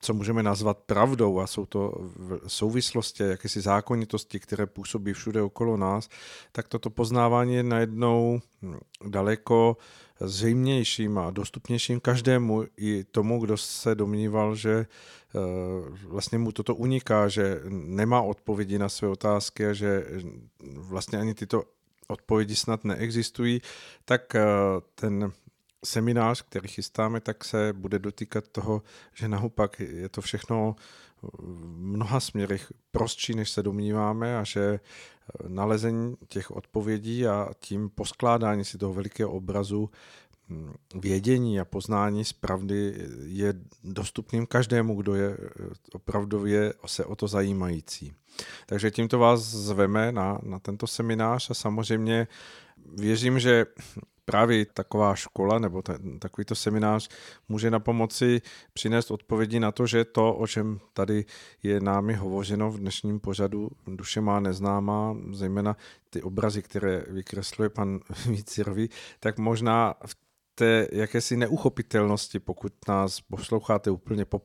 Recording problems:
none

